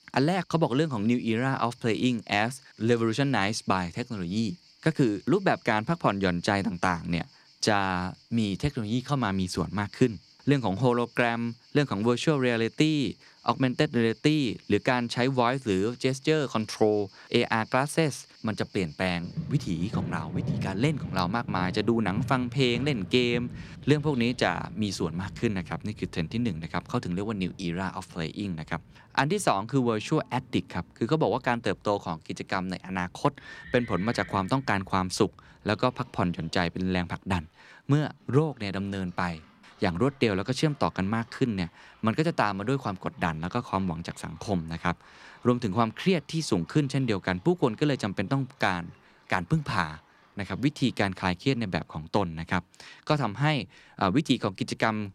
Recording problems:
animal sounds; noticeable; throughout; 15 dB below the speech

